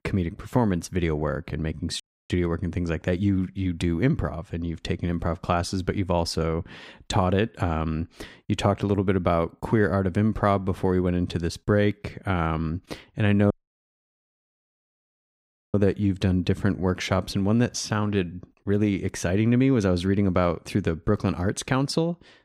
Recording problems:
audio cutting out; at 2 s and at 14 s for 2 s

